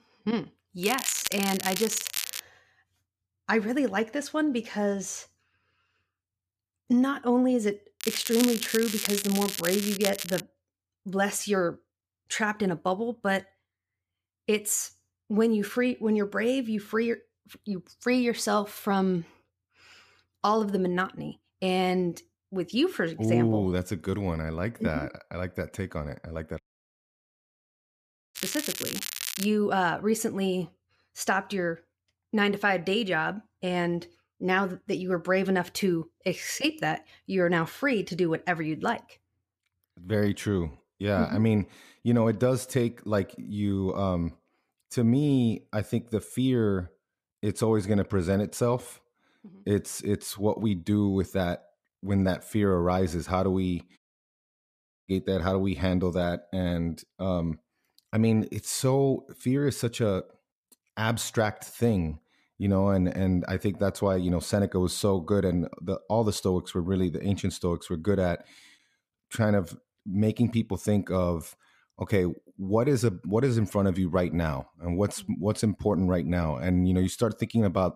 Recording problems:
crackling; loud; from 1 to 2.5 s, from 8 to 10 s and from 28 to 29 s; 4 dB below the speech
audio cutting out; at 27 s for 1.5 s and at 54 s for 1 s

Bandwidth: 14.5 kHz